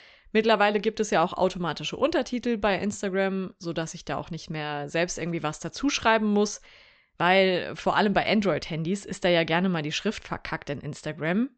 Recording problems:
high frequencies cut off; noticeable; nothing above 8 kHz

